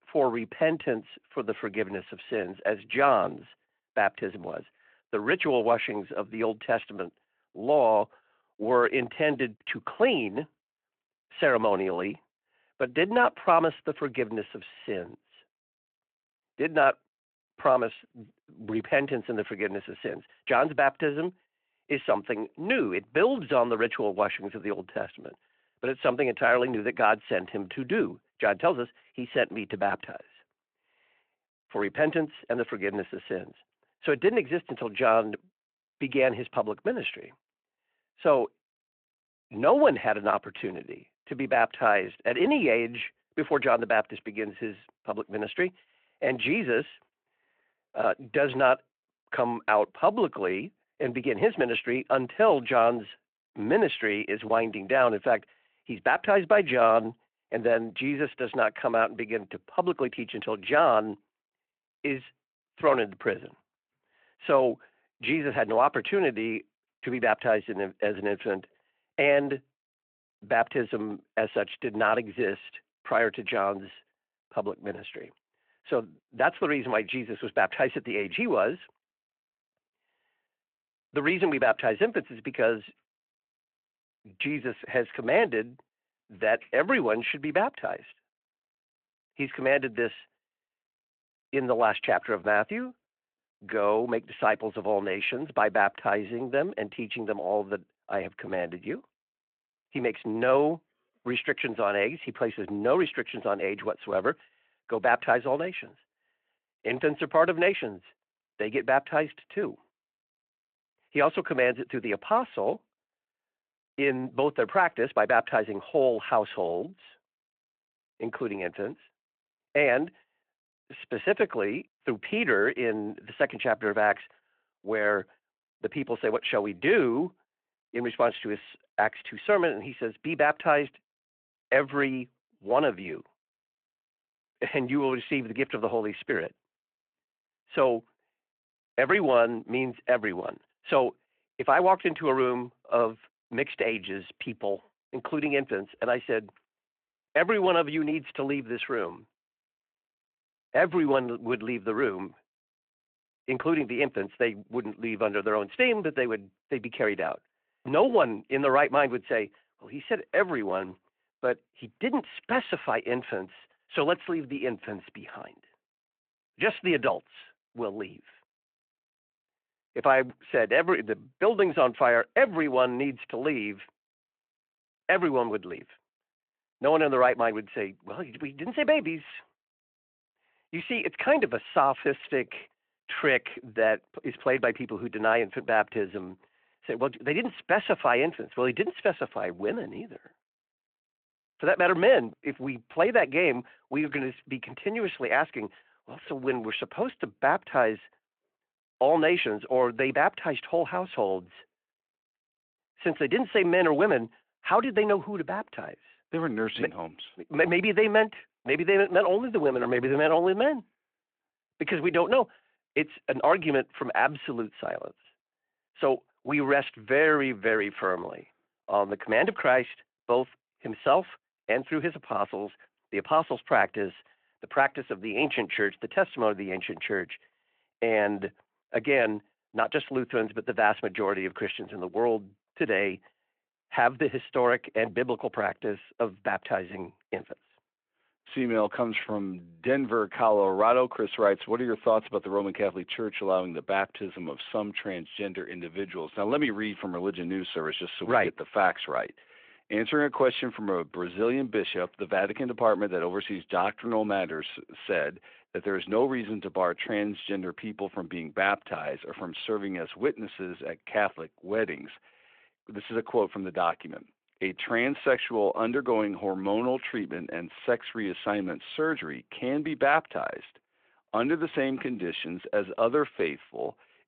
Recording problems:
phone-call audio

